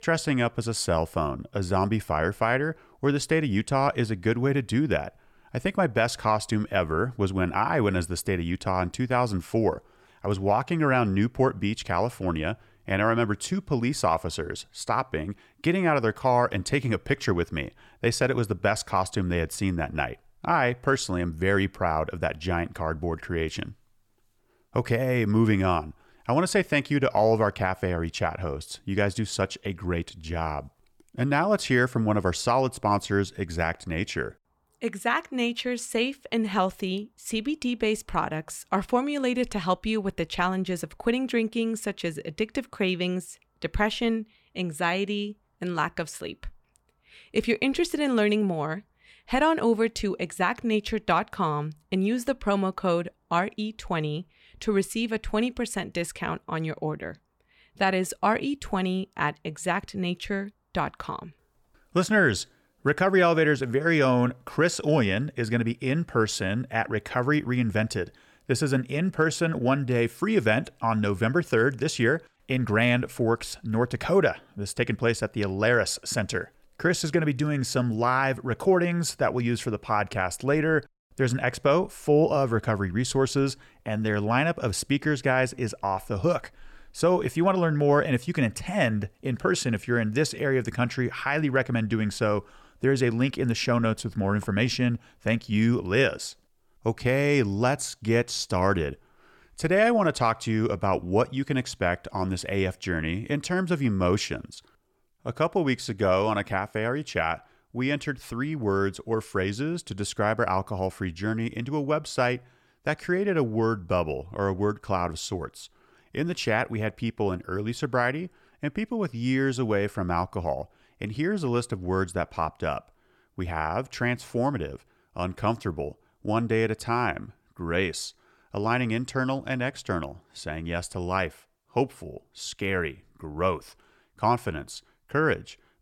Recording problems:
none

